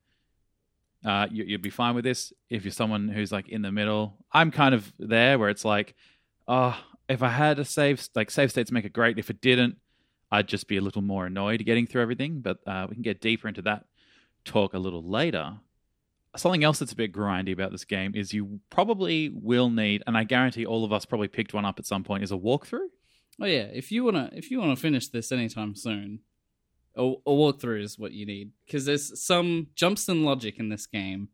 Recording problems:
none

